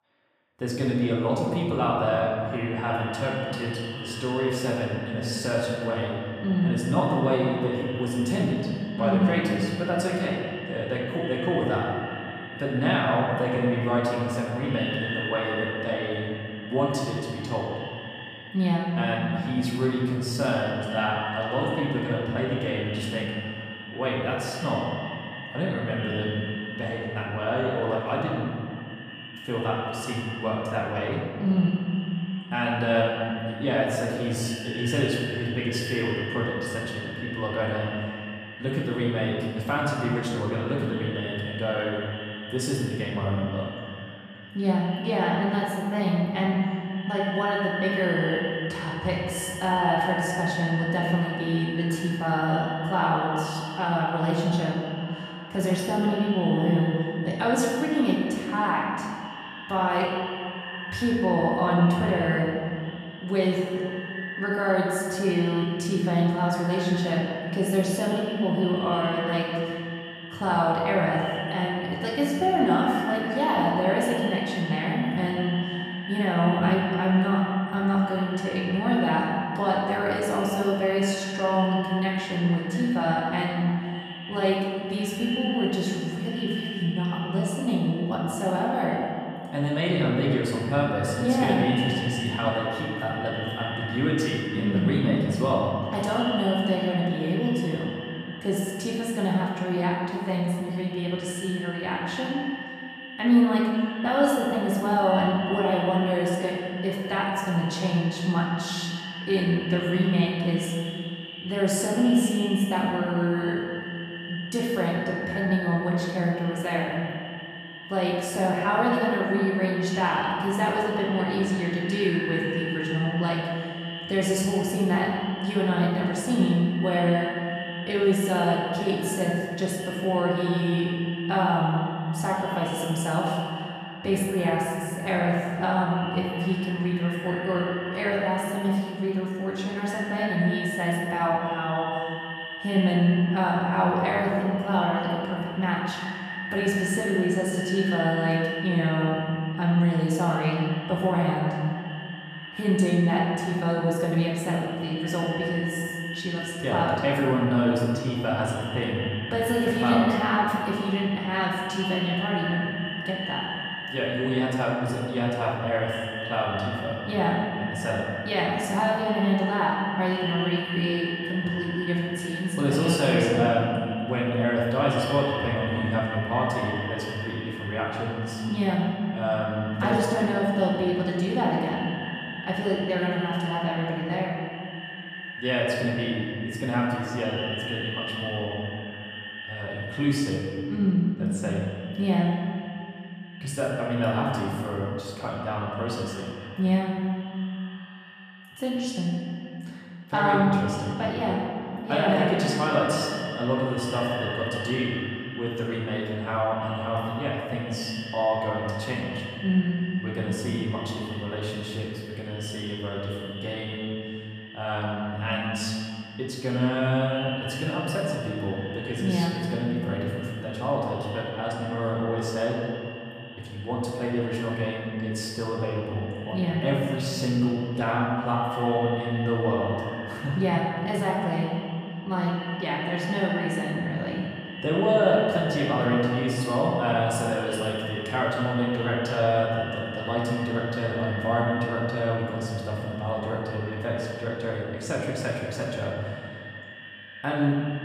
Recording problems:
echo of what is said; strong; throughout; 590 ms later, 10 dB below the speech
off-mic speech; far
room echo; noticeable; dies away in 2 s

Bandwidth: 14.5 kHz